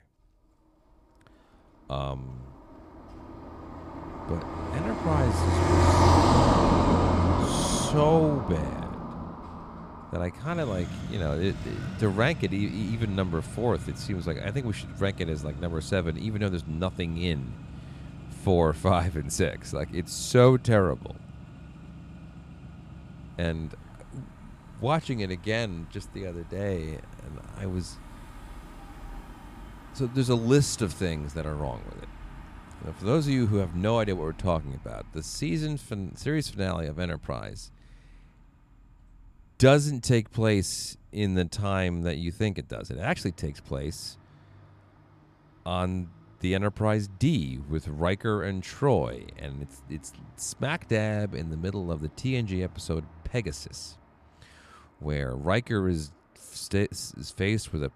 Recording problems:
traffic noise; loud; throughout; 1 dB below the speech

